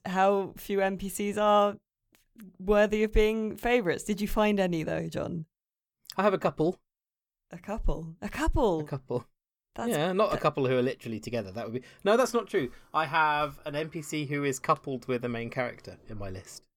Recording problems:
none

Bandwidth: 18 kHz